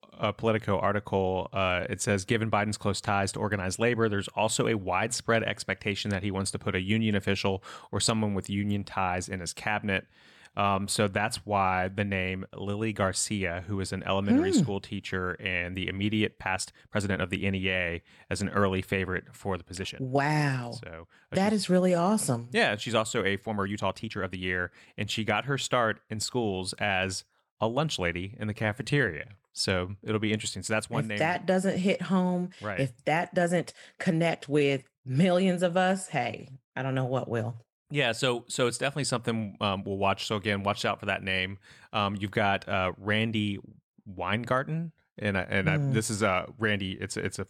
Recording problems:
uneven, jittery; strongly; from 1.5 to 45 s

